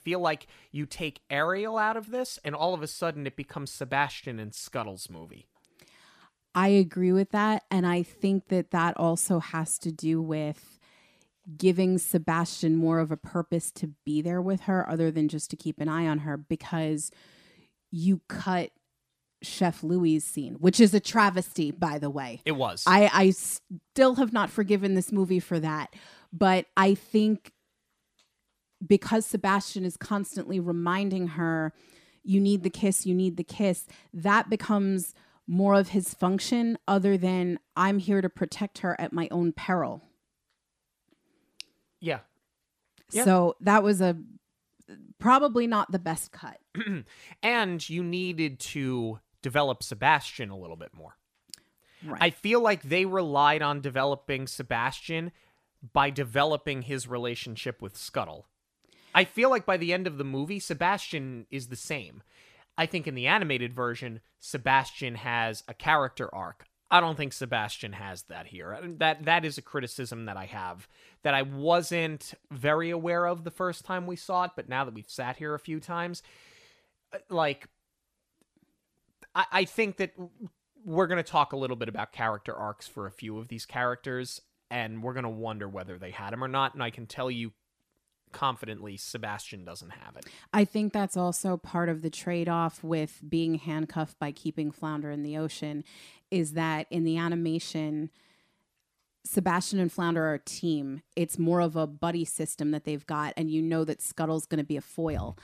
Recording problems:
none

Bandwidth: 14.5 kHz